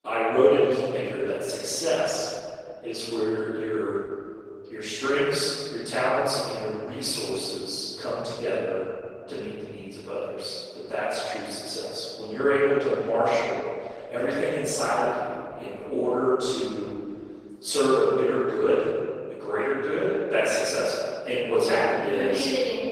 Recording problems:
room echo; strong; dies away in 2.2 s
off-mic speech; far
thin; somewhat; fading below 450 Hz
garbled, watery; slightly; nothing above 16 kHz

